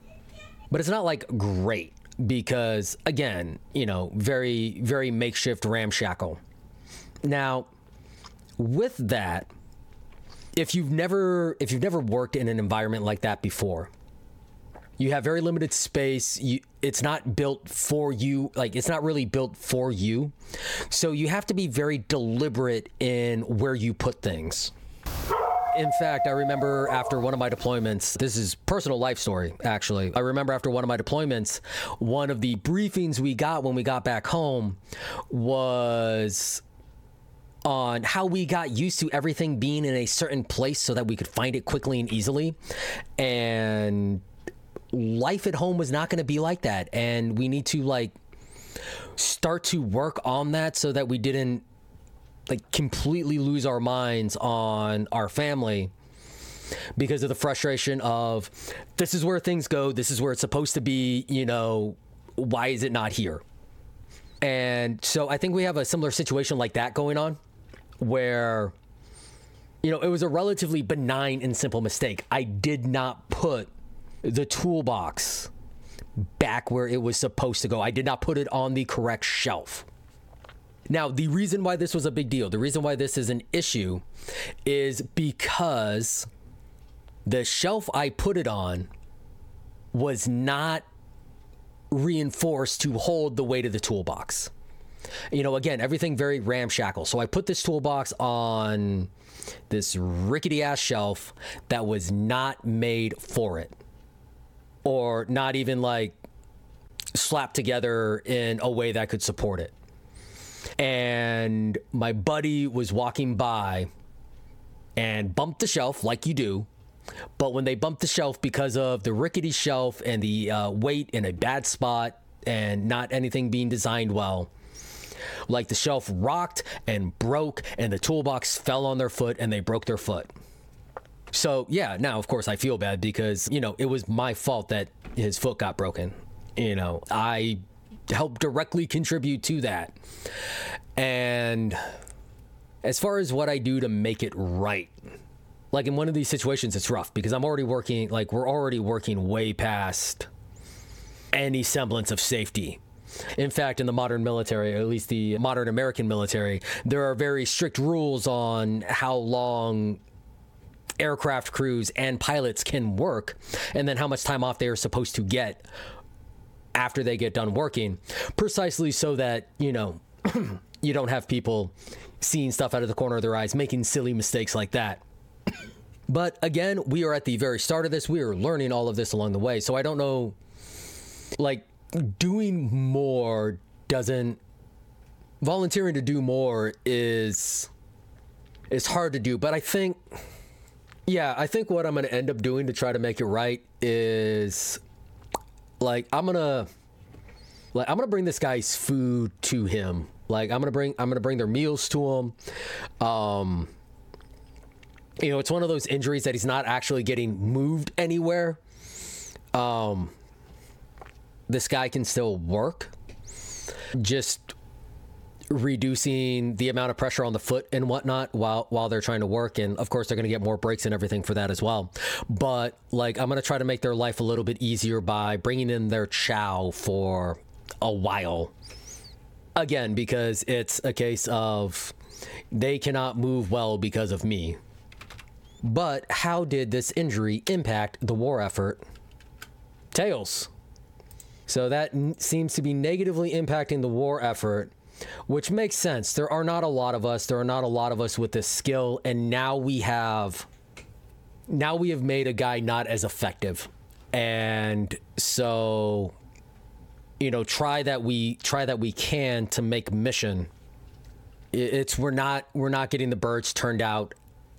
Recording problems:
squashed, flat; heavily
dog barking; loud; from 25 to 28 s; peak 2 dB above the speech

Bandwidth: 17 kHz